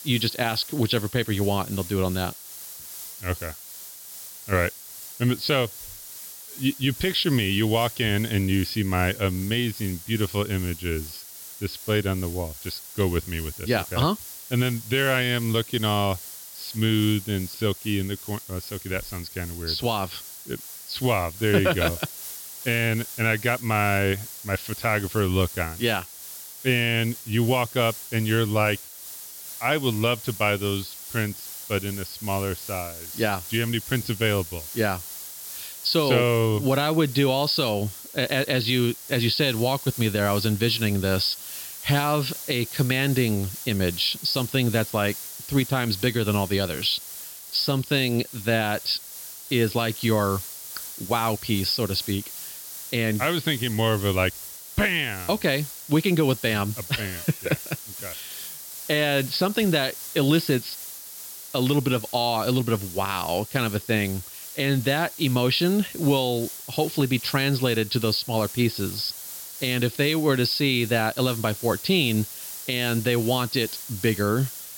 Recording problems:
high frequencies cut off; noticeable; nothing above 5.5 kHz
hiss; noticeable; throughout; 10 dB below the speech

